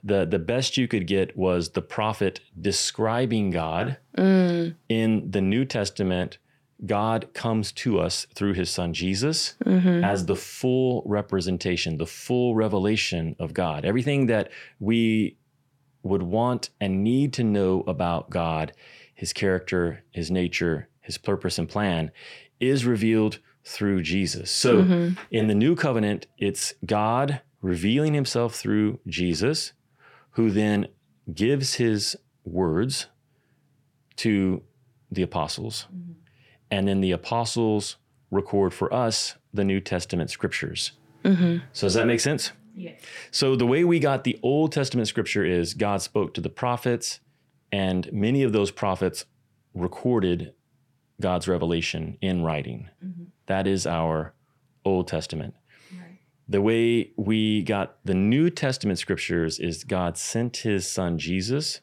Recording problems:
none

